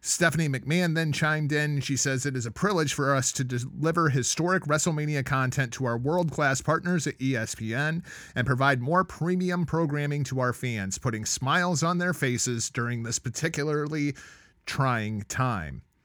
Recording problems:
none

